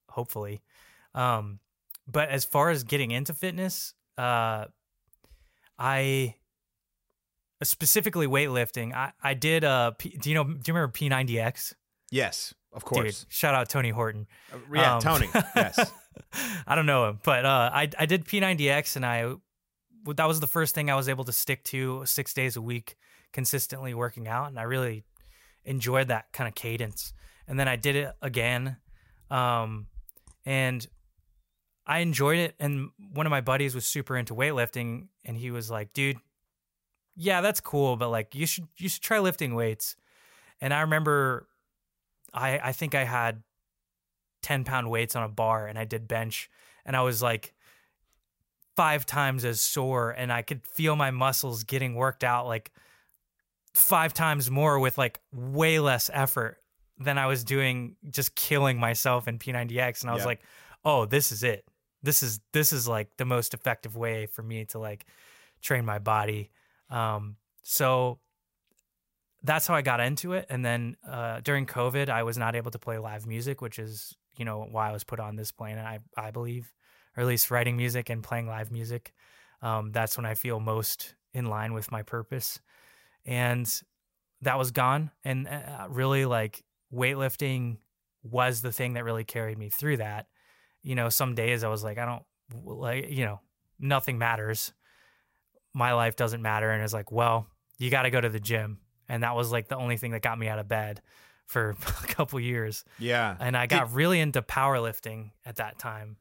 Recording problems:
none

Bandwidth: 16 kHz